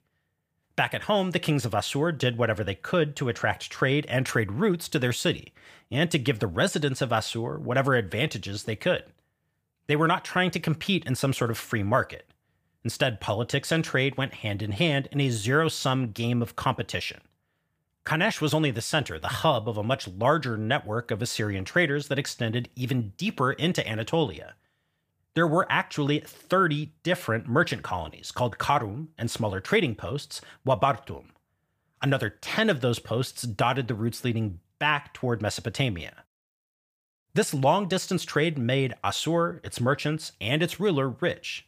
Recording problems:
none

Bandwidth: 15 kHz